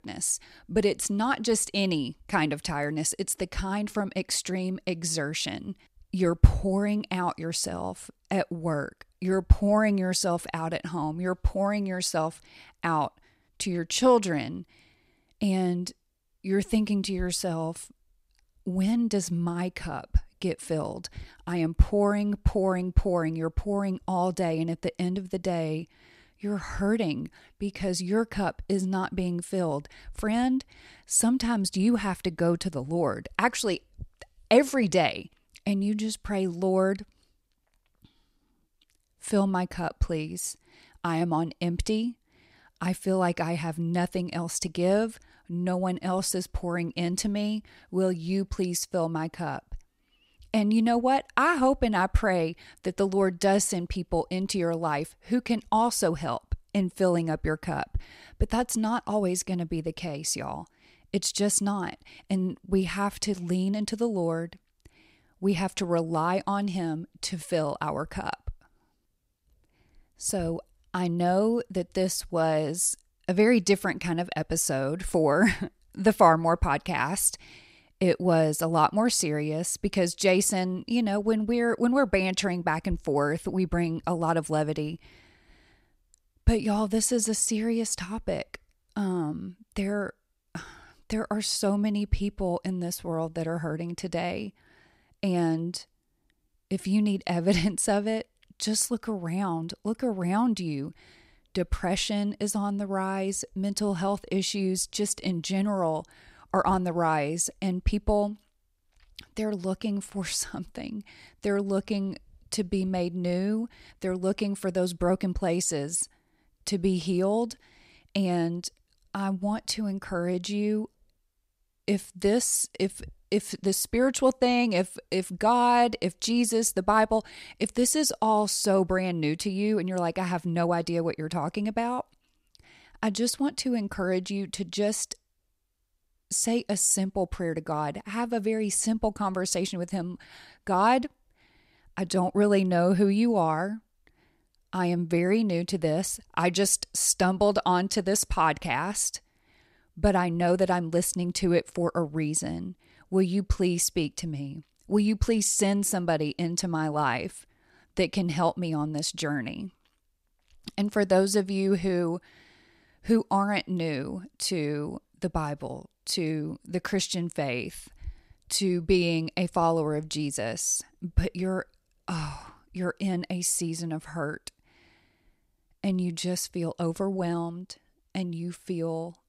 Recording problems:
none

